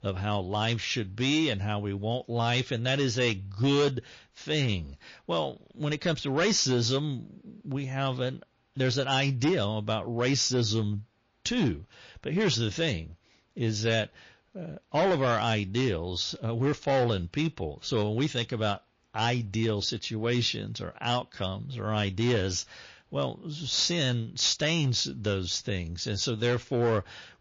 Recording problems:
distortion; slight; 5% of the sound clipped
garbled, watery; slightly; nothing above 6.5 kHz

